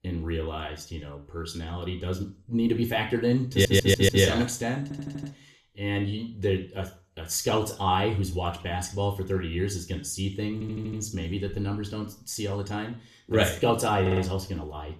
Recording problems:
room echo; slight; dies away in 0.4 s
off-mic speech; somewhat distant
audio stuttering; 4 times, first at 3.5 s

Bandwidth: 13.5 kHz